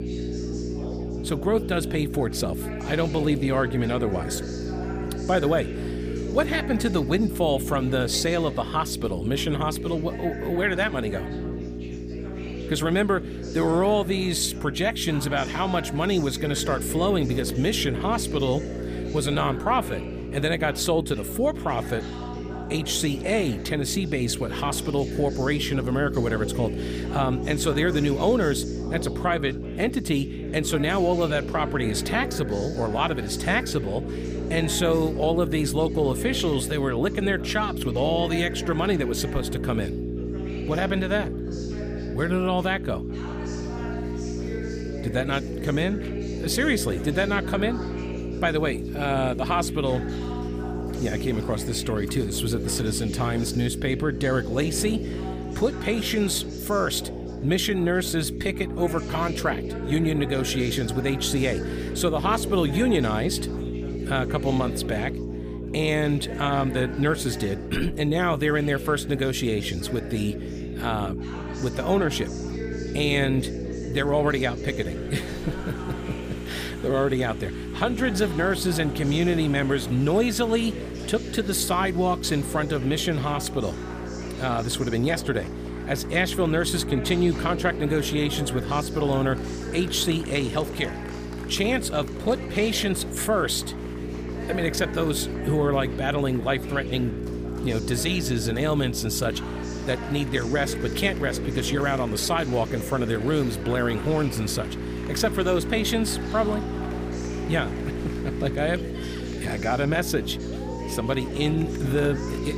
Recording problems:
electrical hum; noticeable; throughout; 60 Hz, 10 dB below the speech
chatter from many people; noticeable; throughout; 15 dB below the speech

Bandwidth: 15 kHz